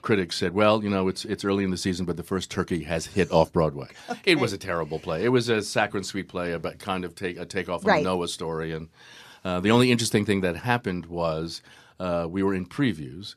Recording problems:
none

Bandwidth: 14.5 kHz